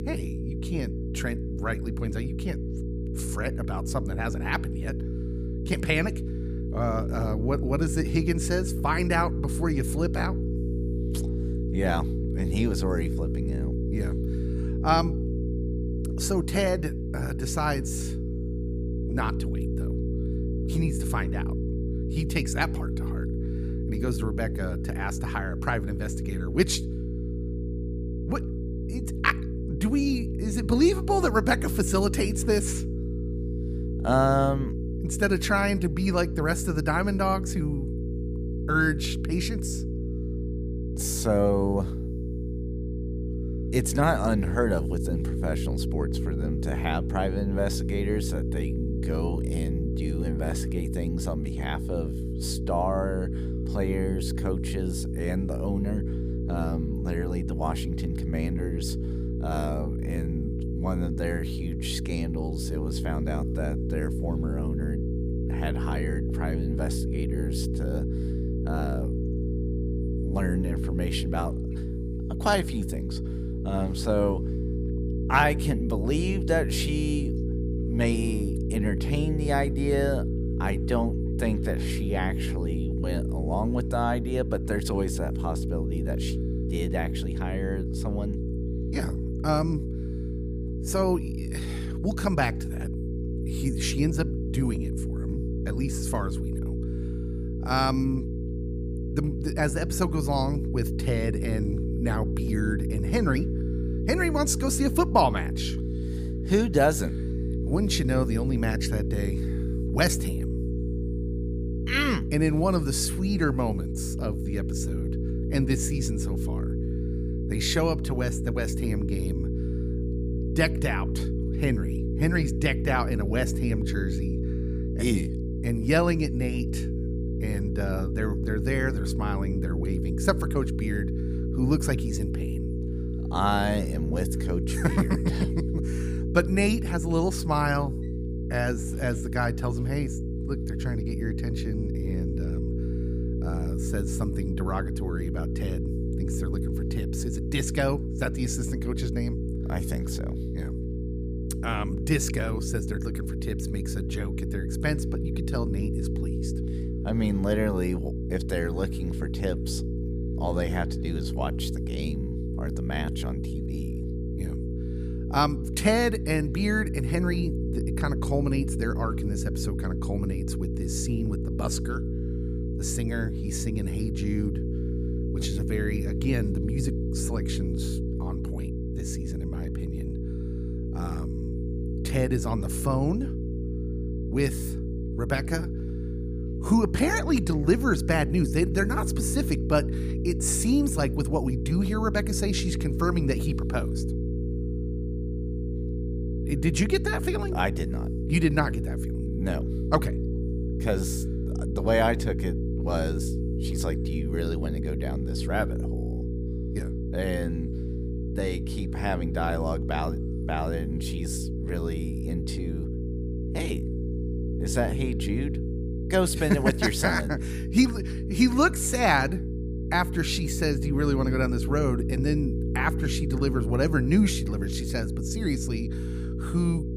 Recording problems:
electrical hum; loud; throughout; 60 Hz, 8 dB below the speech

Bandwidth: 15 kHz